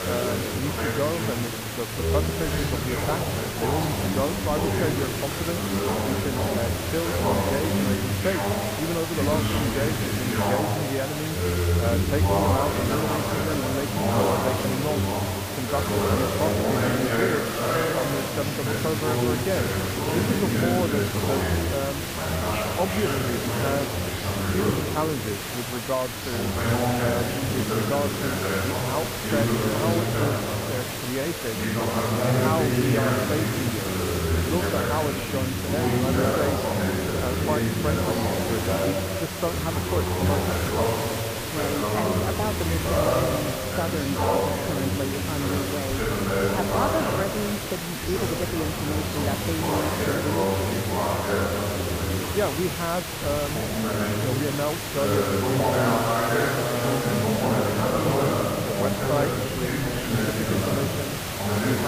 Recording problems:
muffled; slightly; fading above 2.5 kHz
chatter from many people; very loud; throughout; 4 dB above the speech
hiss; loud; throughout; 1 dB below the speech
traffic noise; very faint; throughout; 20 dB below the speech
abrupt cut into speech; at the end

